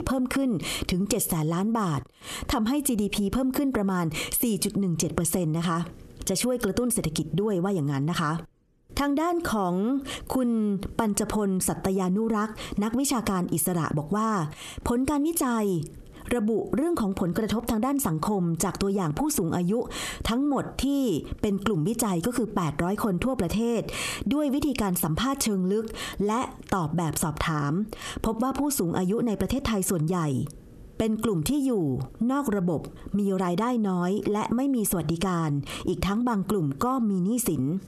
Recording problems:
squashed, flat; heavily

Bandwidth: 13.5 kHz